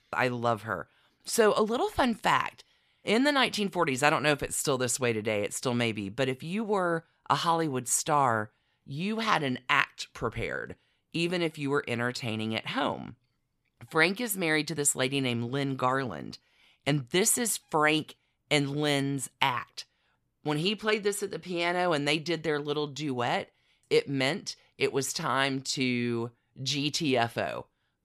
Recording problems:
none

